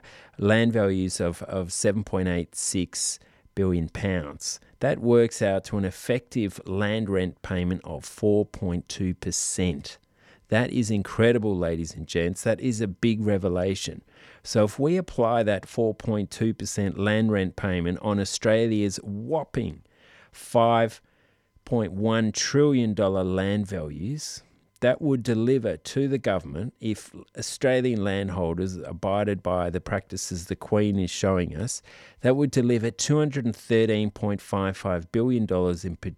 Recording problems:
none

